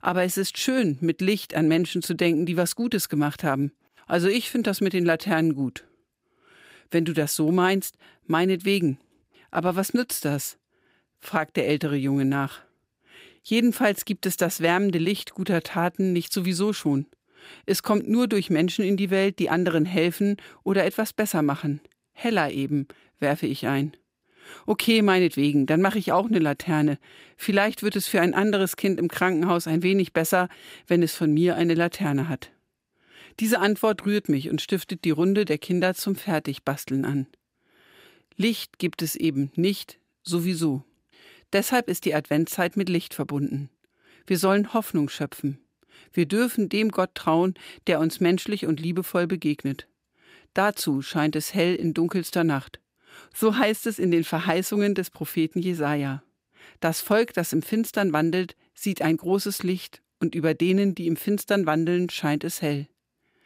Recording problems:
none

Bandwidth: 15.5 kHz